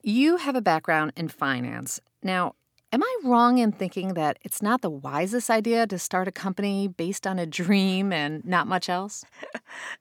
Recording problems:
none

